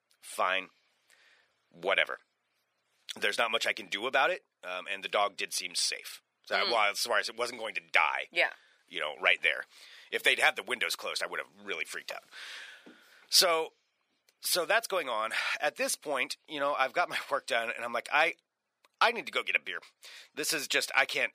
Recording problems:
thin; very; fading below 700 Hz

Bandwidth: 15 kHz